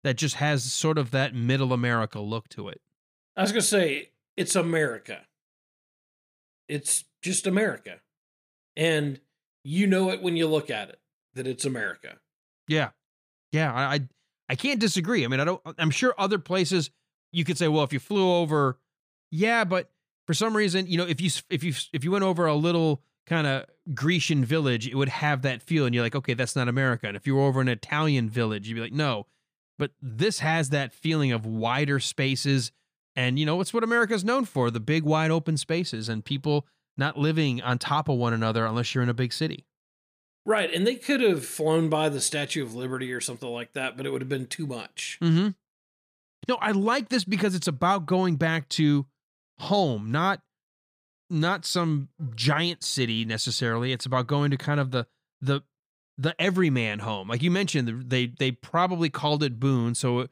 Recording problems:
none

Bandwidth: 15 kHz